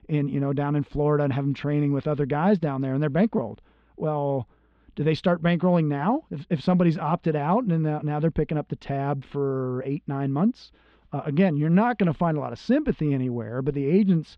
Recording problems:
muffled; slightly; fading above 3.5 kHz

